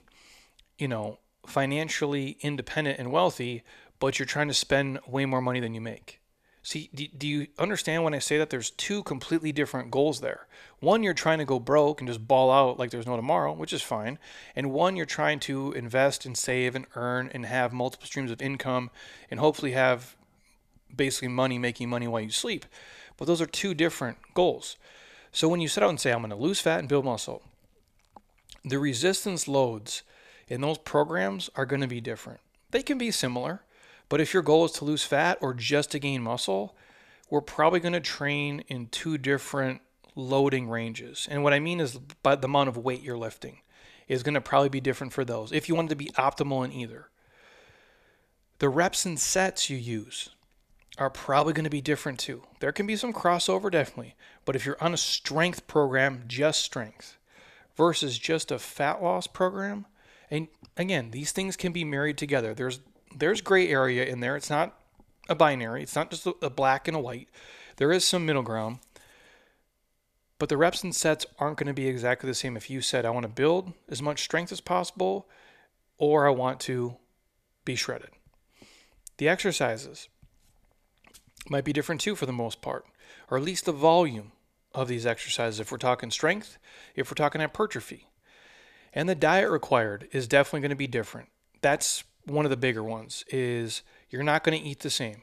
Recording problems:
none

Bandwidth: 14.5 kHz